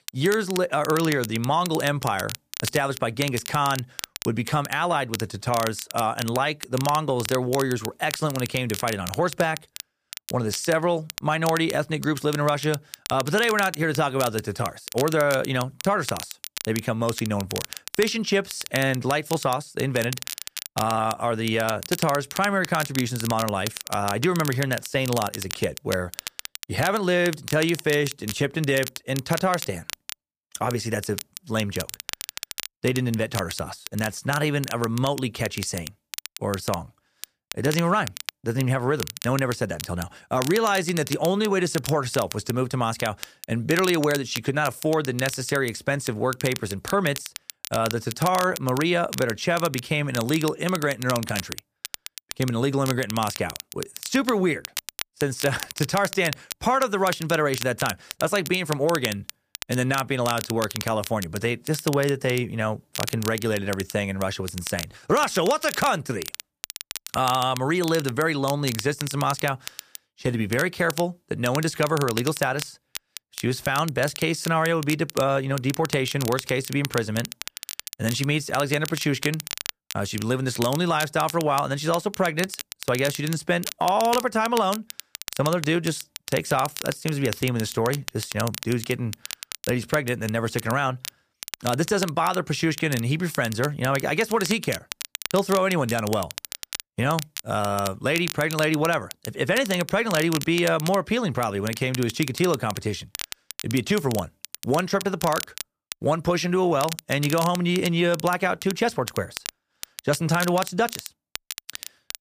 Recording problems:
crackle, like an old record; noticeable; 10 dB below the speech

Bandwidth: 15 kHz